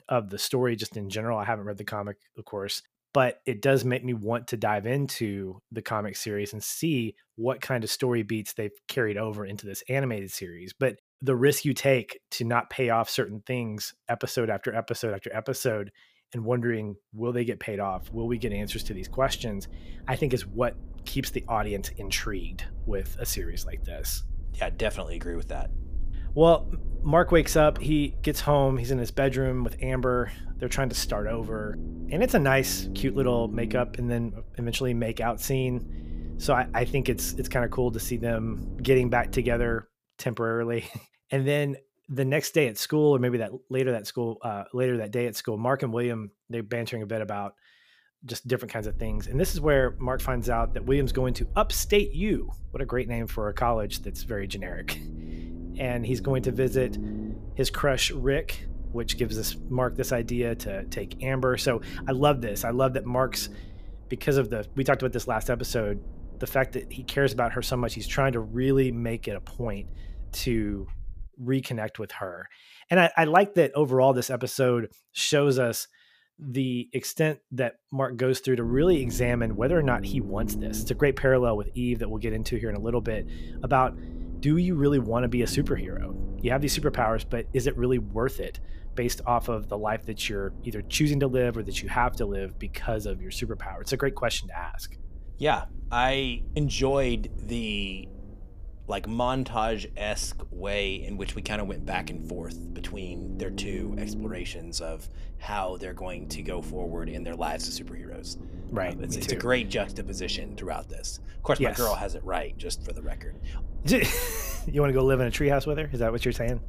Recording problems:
low rumble; faint; from 18 to 40 s, from 49 s to 1:11 and from 1:19 on; 20 dB below the speech

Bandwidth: 15 kHz